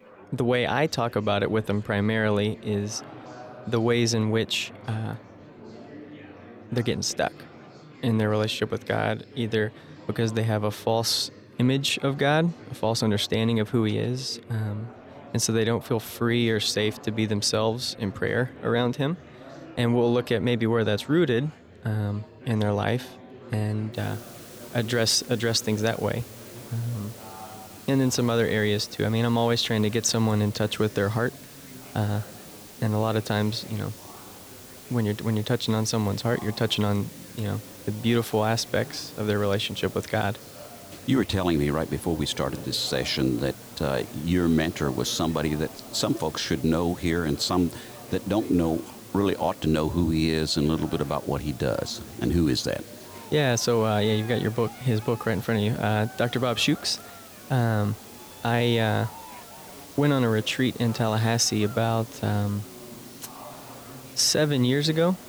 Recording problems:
murmuring crowd; noticeable; throughout; 20 dB below the speech
hiss; noticeable; from 24 s on; 20 dB below the speech

